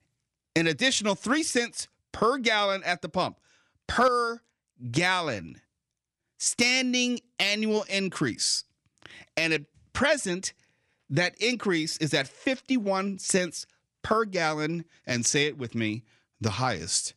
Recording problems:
none

